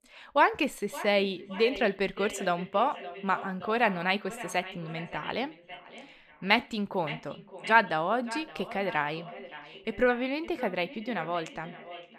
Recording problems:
echo of what is said; noticeable; throughout; 570 ms later, 15 dB below the speech

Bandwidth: 14.5 kHz